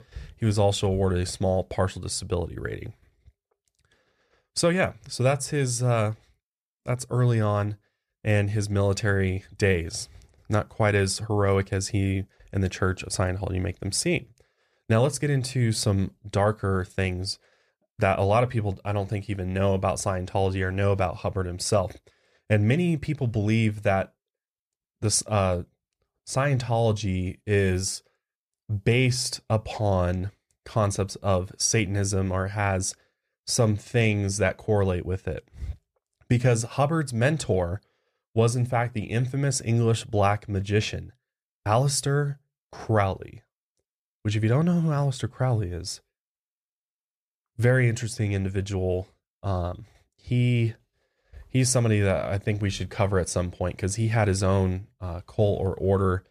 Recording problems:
none

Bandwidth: 14.5 kHz